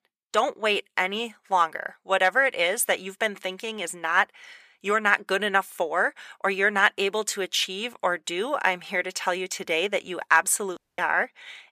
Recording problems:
thin; somewhat; fading below 950 Hz
audio cutting out; at 11 s

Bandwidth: 15 kHz